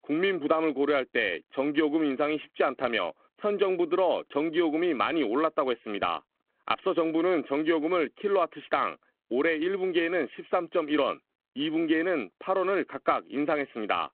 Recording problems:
phone-call audio

